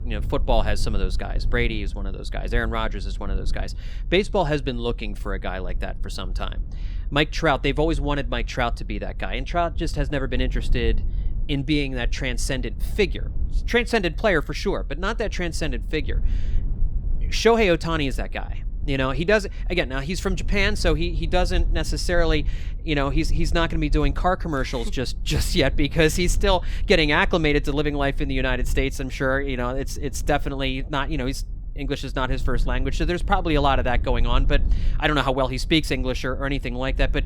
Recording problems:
low rumble; faint; throughout; 25 dB below the speech

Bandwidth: 18.5 kHz